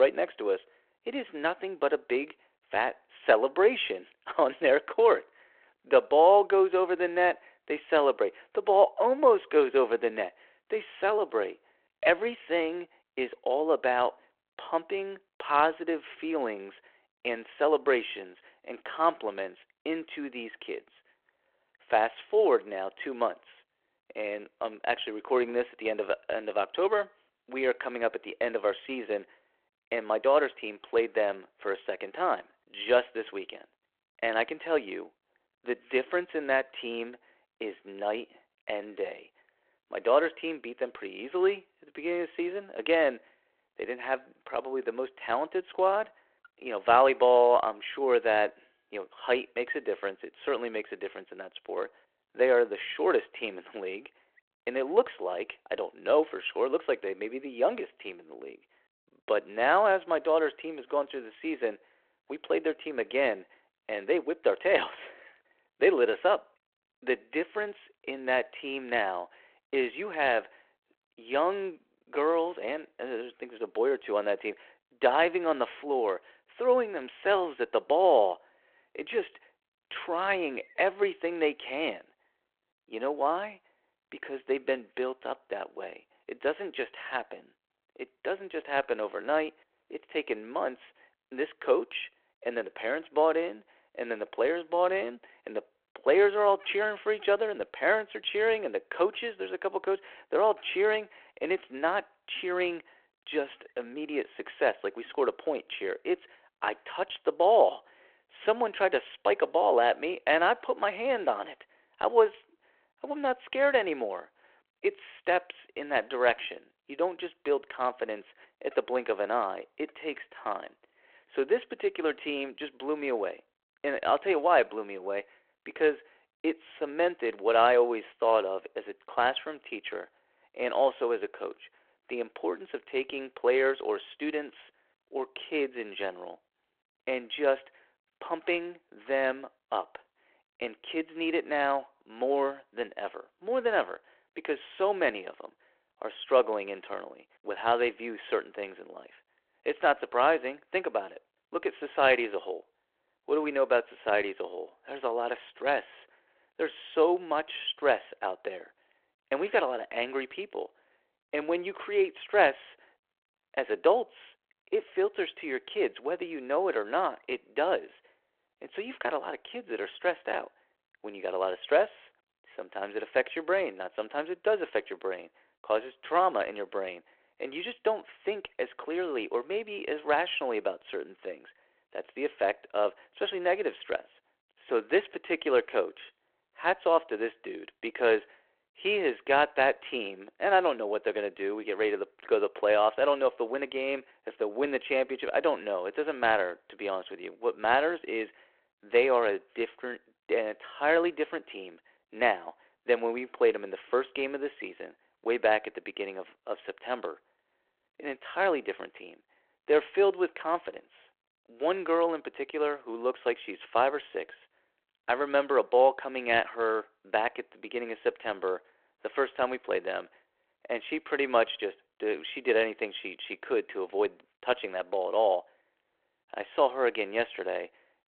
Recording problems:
phone-call audio
abrupt cut into speech; at the start

